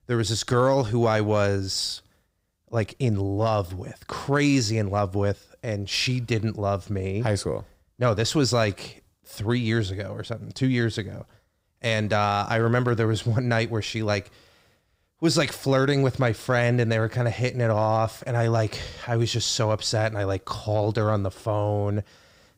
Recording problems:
none

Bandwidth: 15.5 kHz